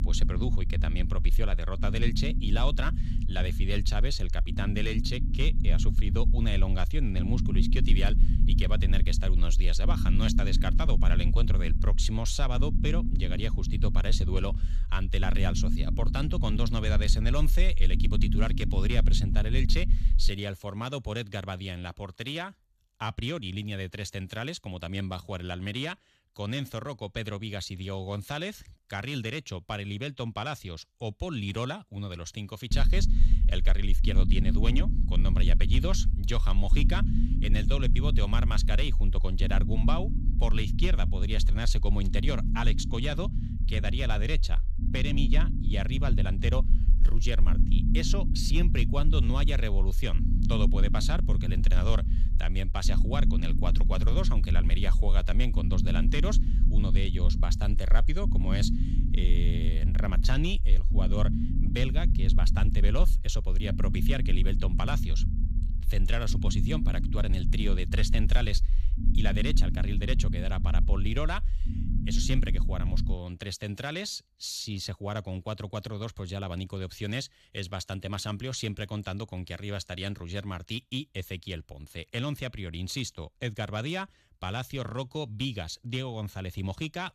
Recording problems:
low rumble; loud; until 20 s and from 33 s to 1:13; 8 dB below the speech

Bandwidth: 14.5 kHz